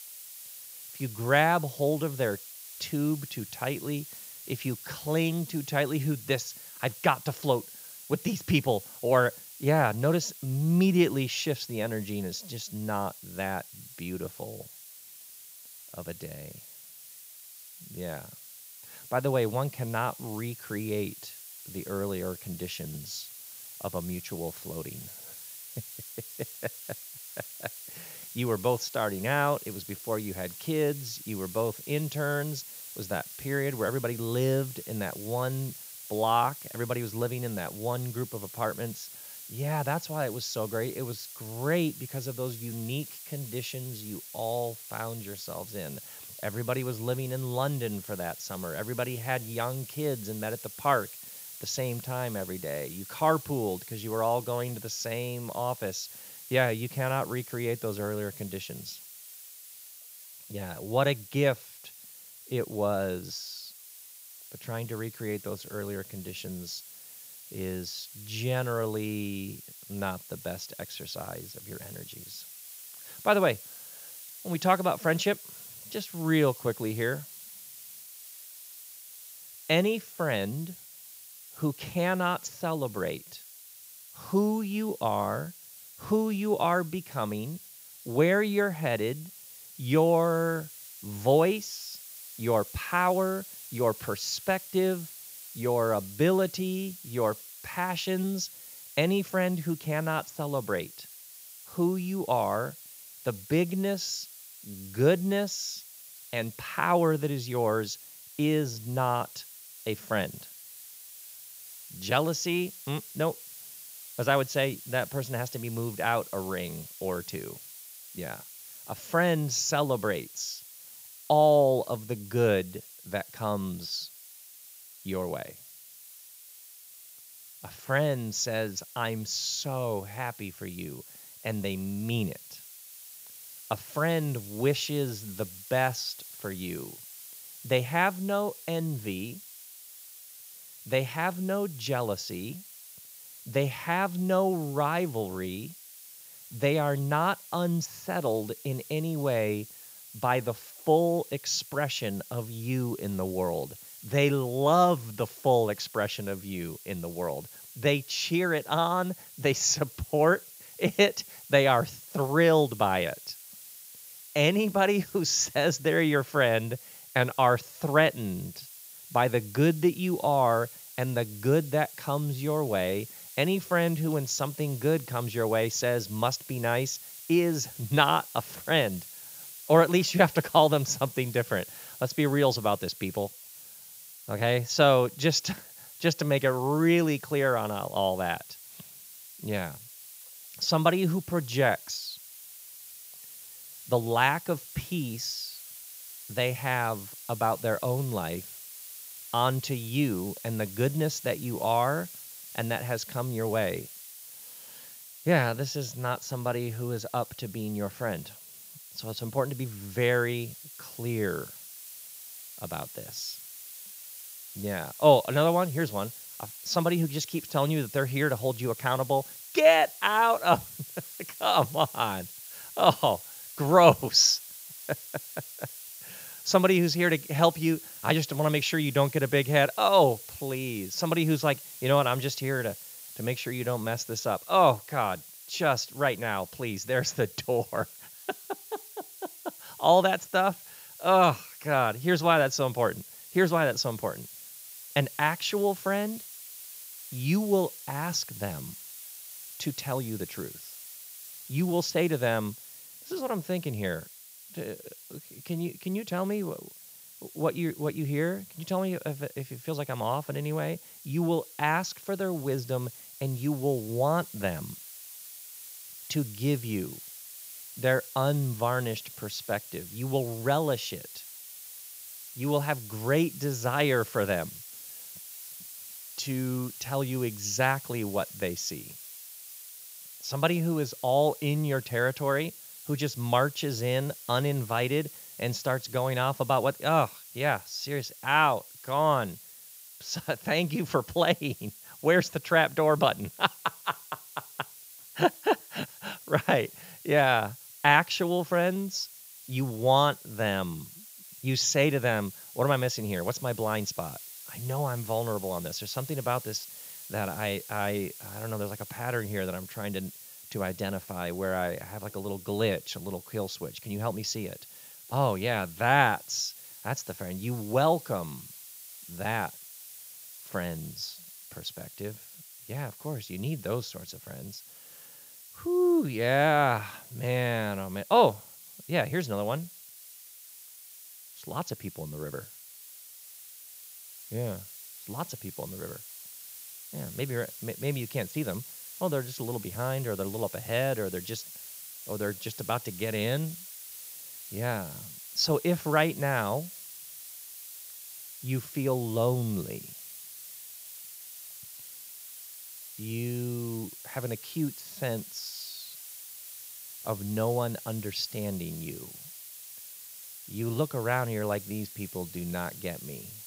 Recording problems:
high frequencies cut off; noticeable; nothing above 7 kHz
hiss; noticeable; throughout; 15 dB below the speech

